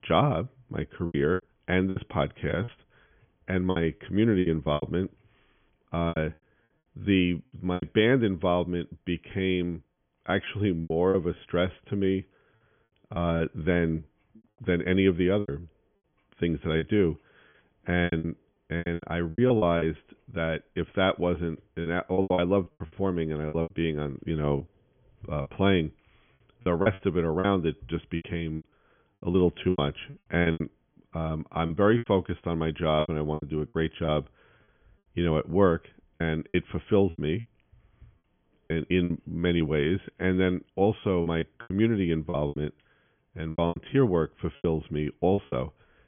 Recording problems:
high frequencies cut off; severe; nothing above 3.5 kHz
choppy; very; 12% of the speech affected

